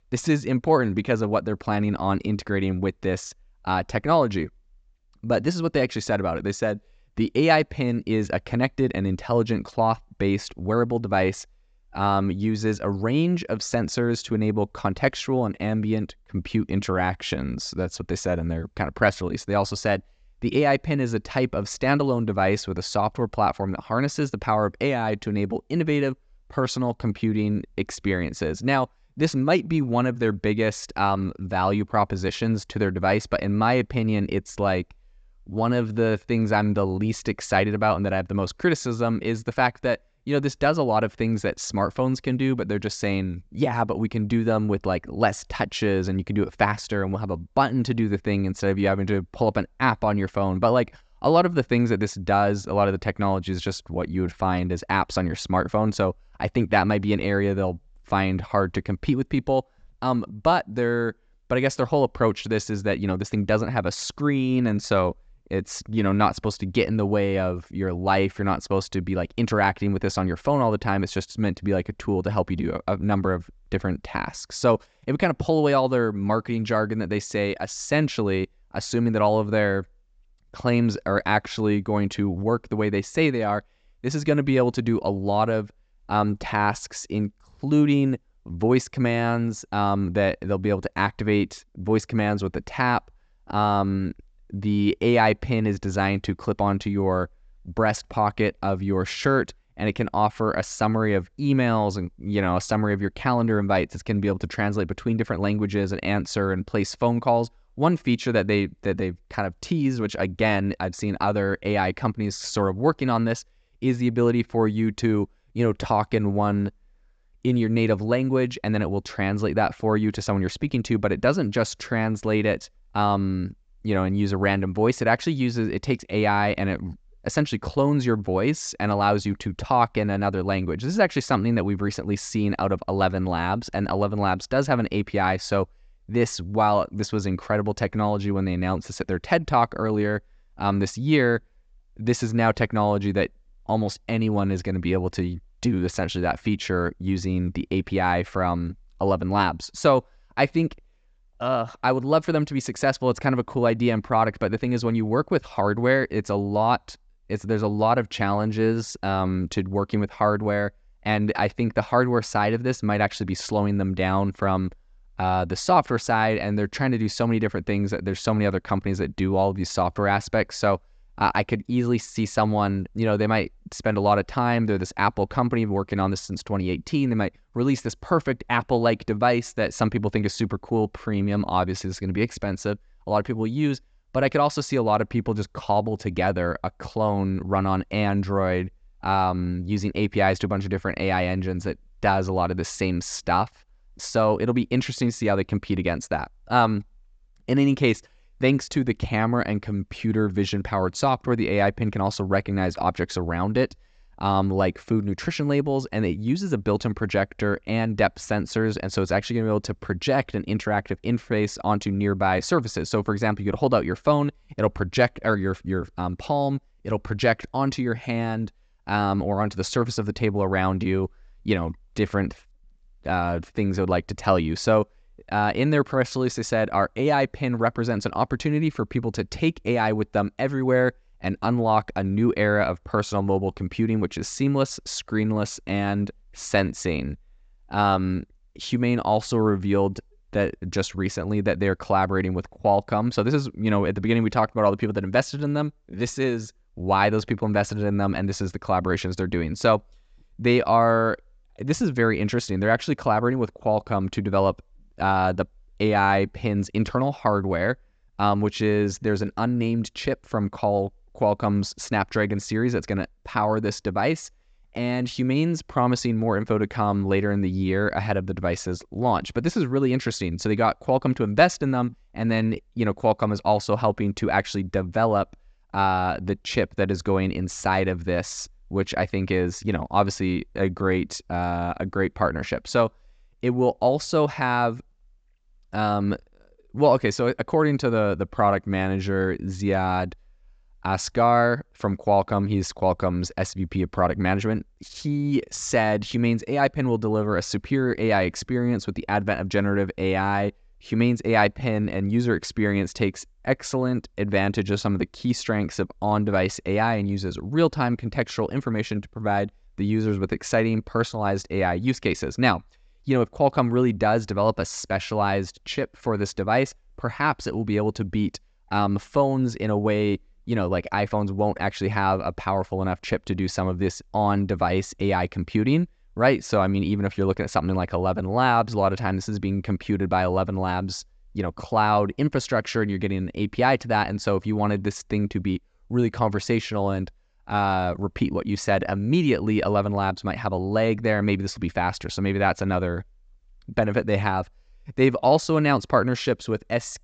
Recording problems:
high frequencies cut off; noticeable; nothing above 8 kHz

